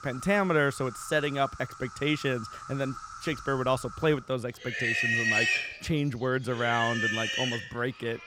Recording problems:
animal sounds; very loud; throughout; 1 dB above the speech

